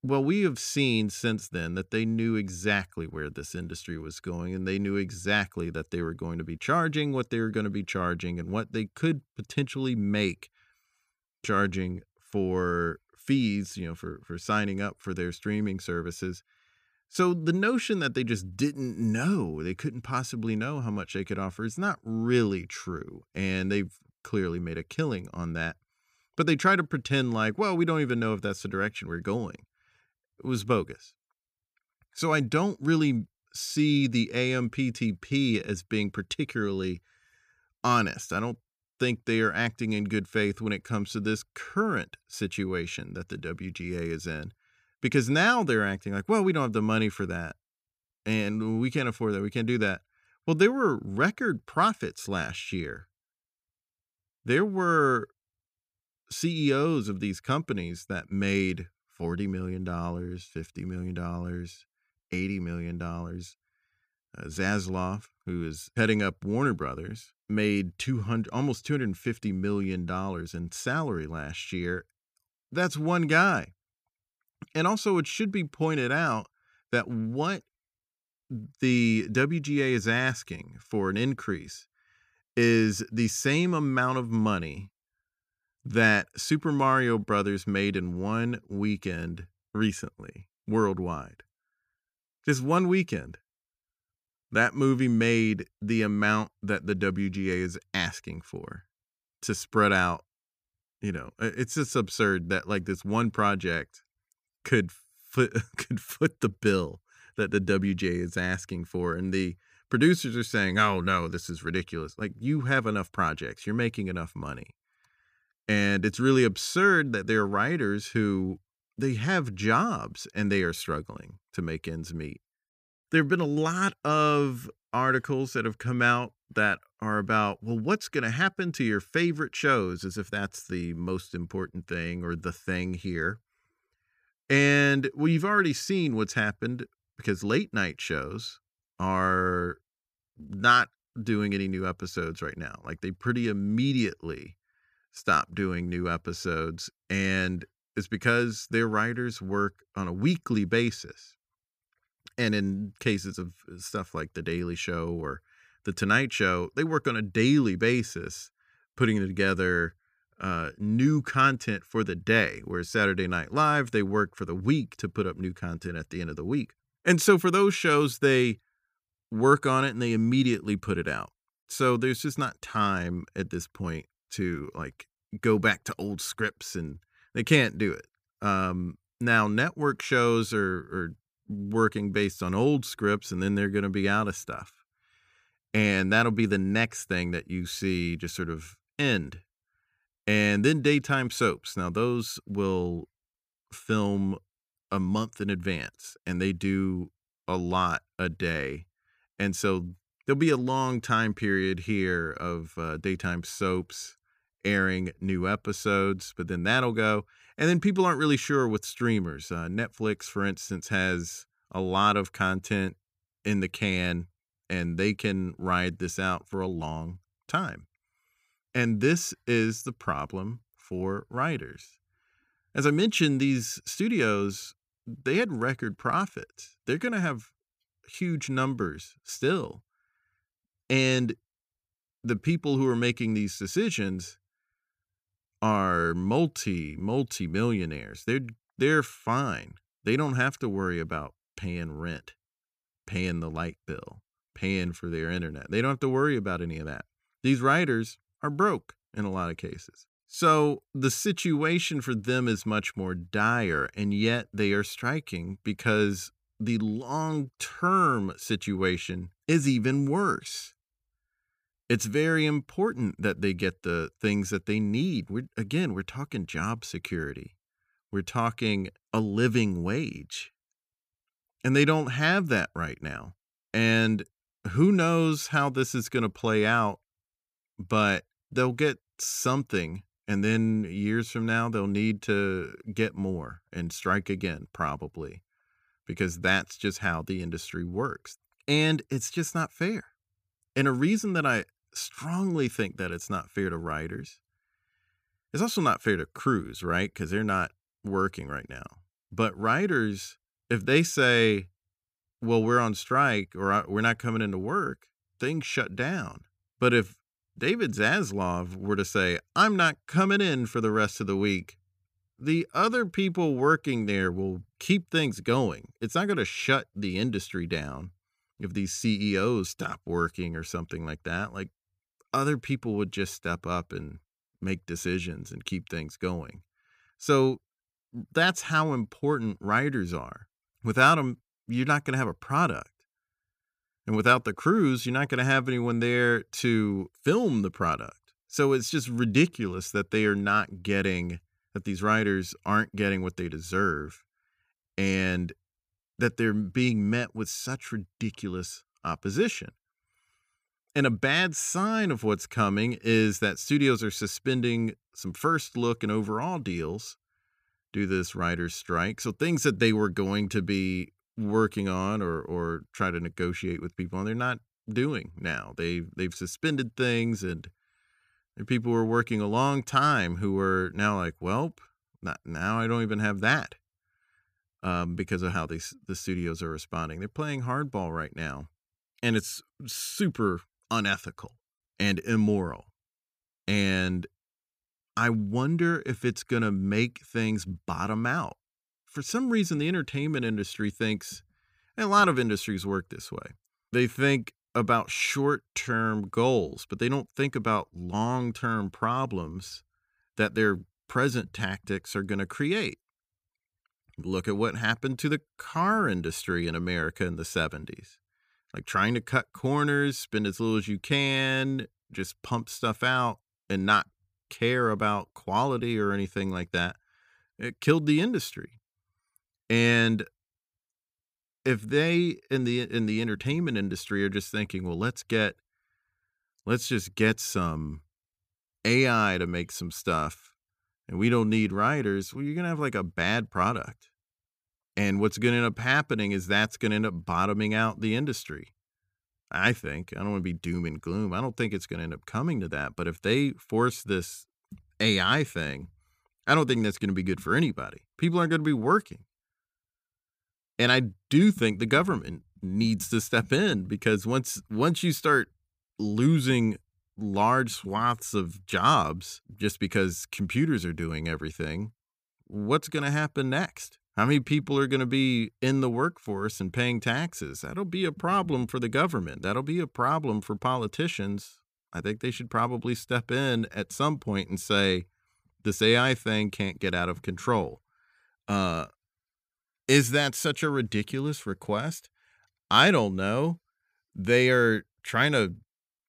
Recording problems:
uneven, jittery; strongly; from 4:33 to 7:56

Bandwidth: 15 kHz